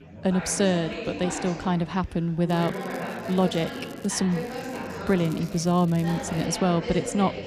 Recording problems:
chatter from many people; loud; throughout; 9 dB below the speech
crackling; faint; from 2.5 to 4 s and from 4.5 to 6.5 s; 25 dB below the speech

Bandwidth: 14.5 kHz